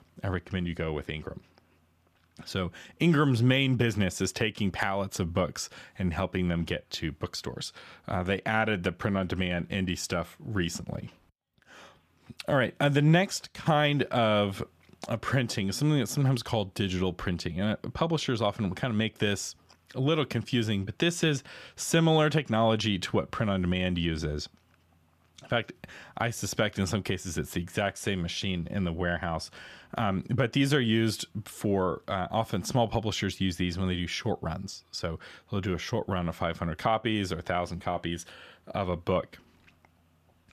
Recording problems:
none

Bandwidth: 14.5 kHz